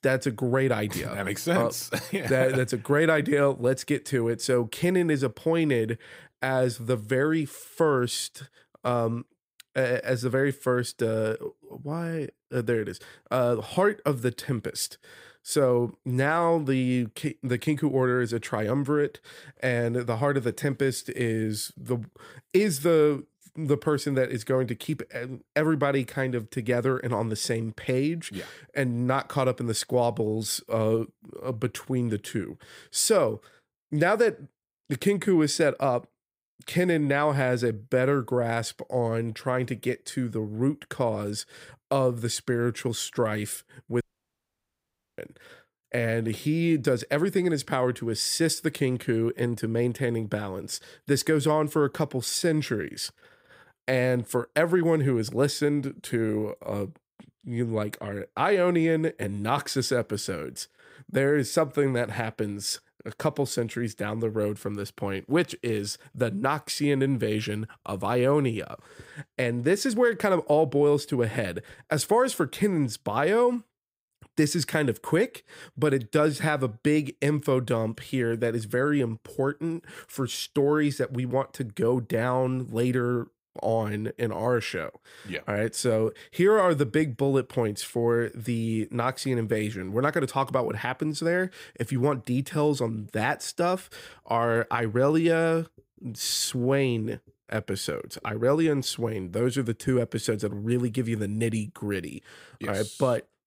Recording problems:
audio cutting out; at 44 s for 1 s

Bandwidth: 15.5 kHz